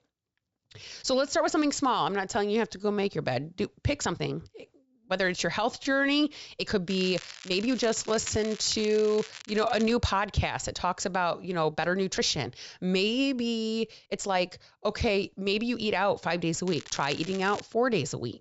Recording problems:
high frequencies cut off; noticeable; nothing above 8 kHz
crackling; noticeable; from 7 to 10 s and at 17 s; 15 dB below the speech
uneven, jittery; strongly; from 0.5 to 18 s

